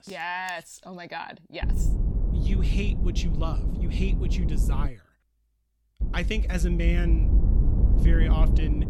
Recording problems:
low rumble; loud; from 1.5 to 5 s and from 6 s on; 6 dB below the speech

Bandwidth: 17.5 kHz